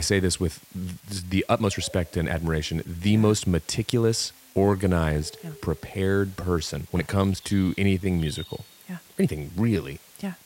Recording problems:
animal sounds; faint; throughout; 25 dB below the speech
hiss; faint; throughout; 25 dB below the speech
abrupt cut into speech; at the start
uneven, jittery; strongly; from 1 to 10 s

